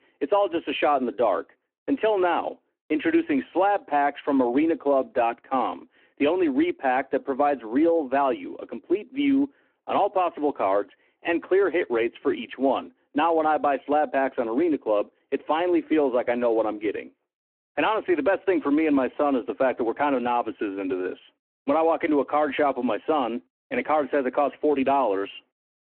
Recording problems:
phone-call audio

